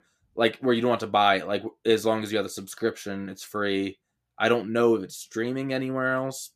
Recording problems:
none

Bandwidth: 14.5 kHz